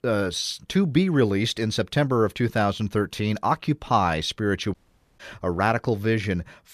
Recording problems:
audio cutting out; at 4.5 s

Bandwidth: 14.5 kHz